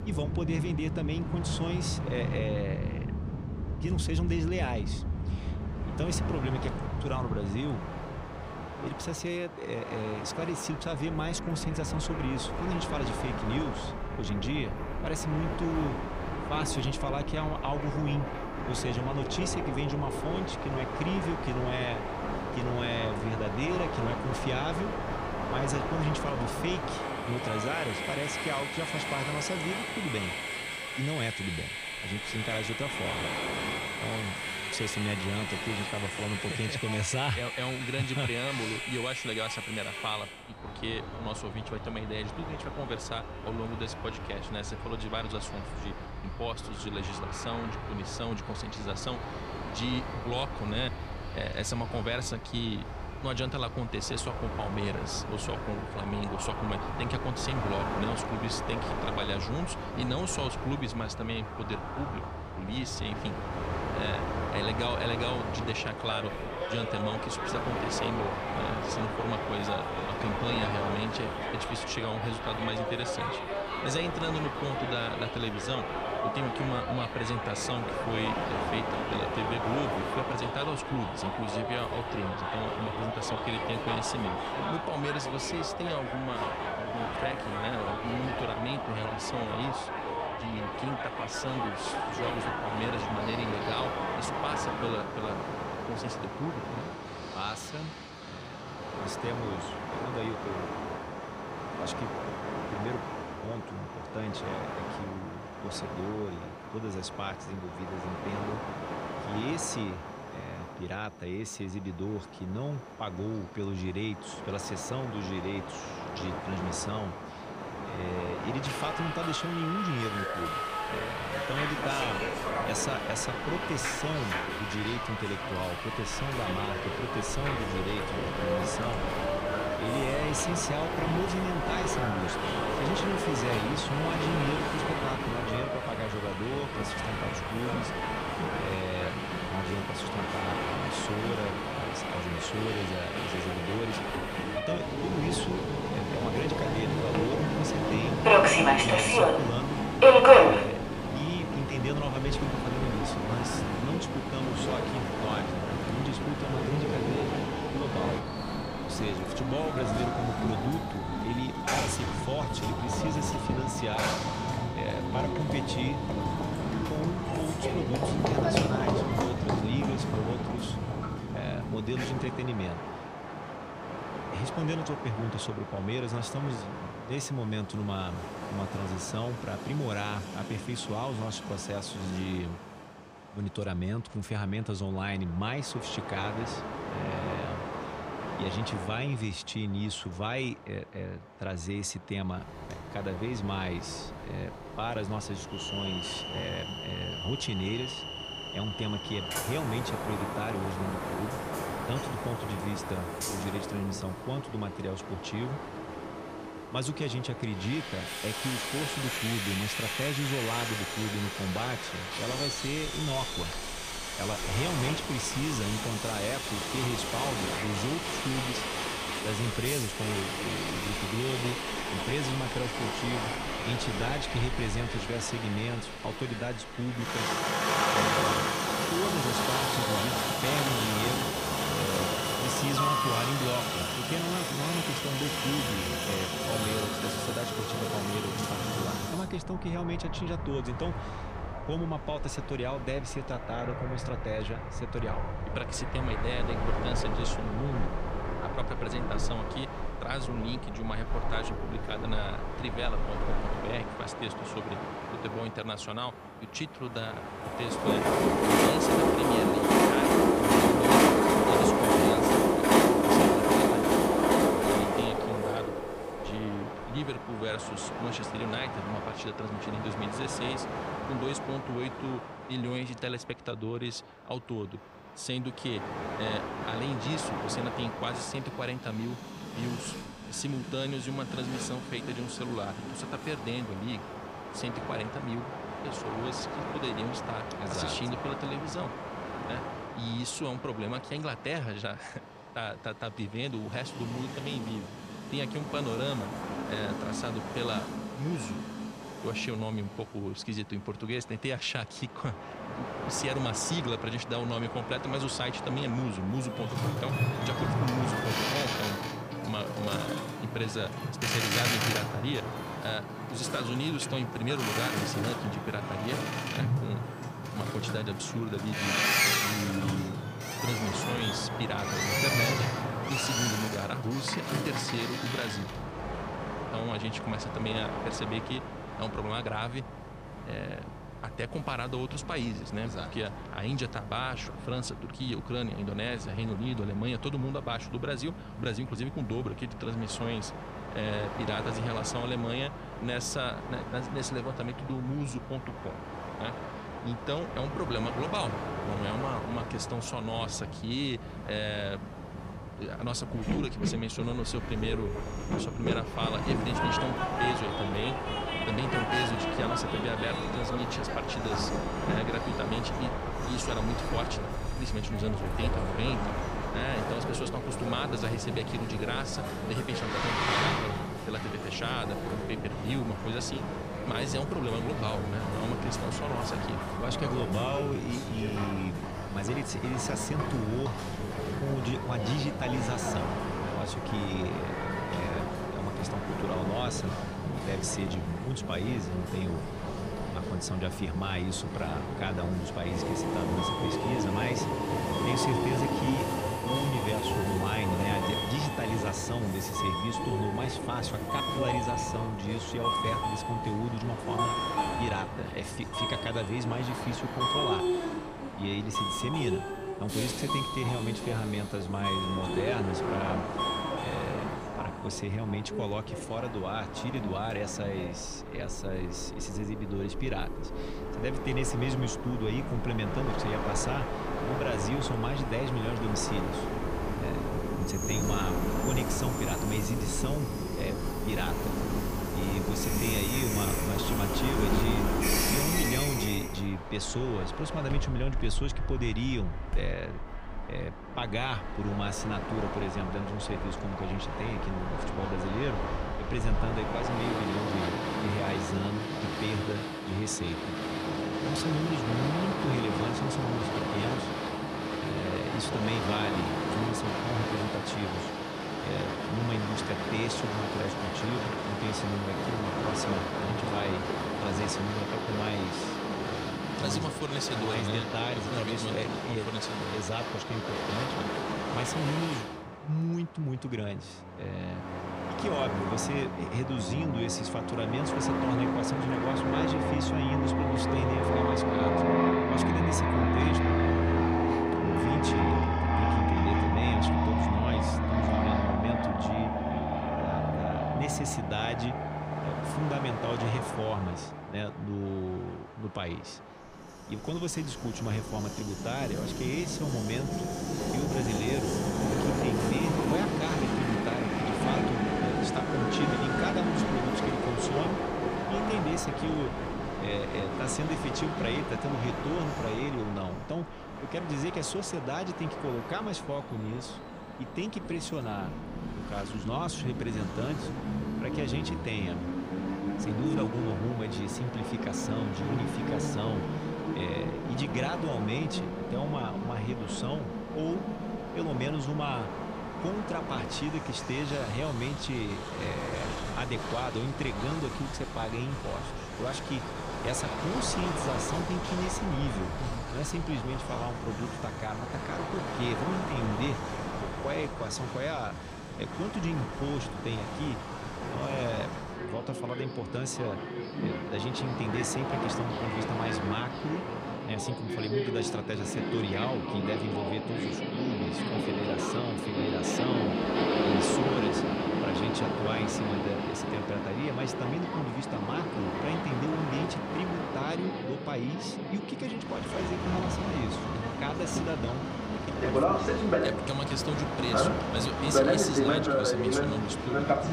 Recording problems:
train or aircraft noise; very loud; throughout; 3 dB above the speech

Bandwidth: 15 kHz